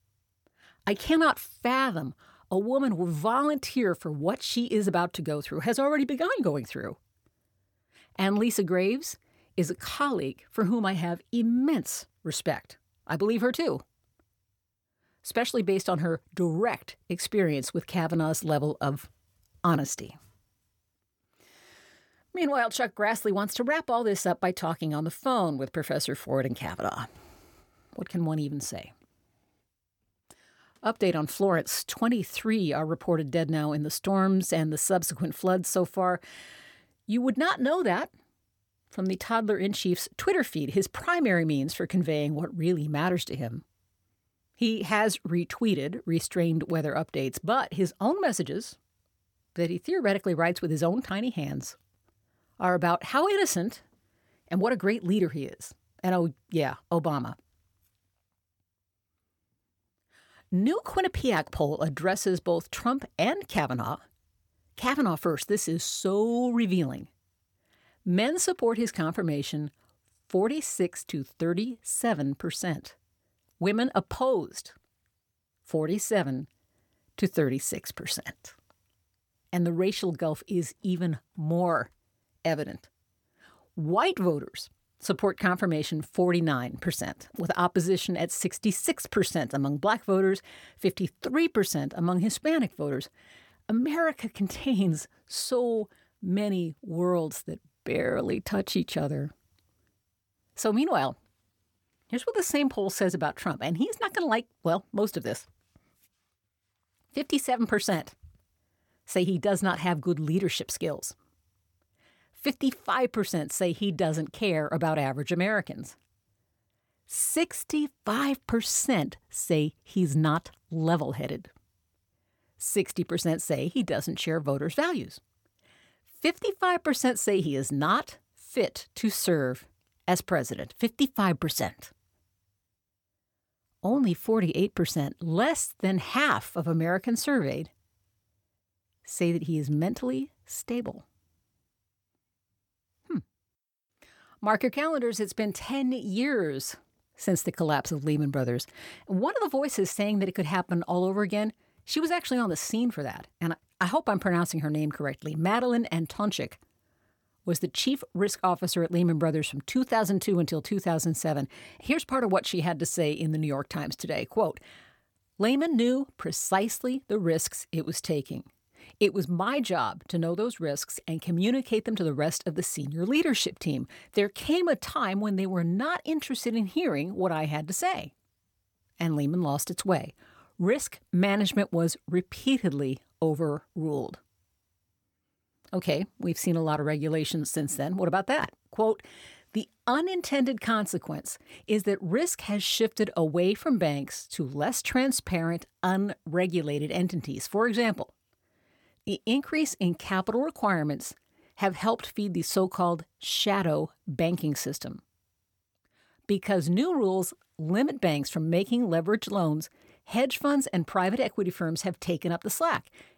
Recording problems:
none

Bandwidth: 18 kHz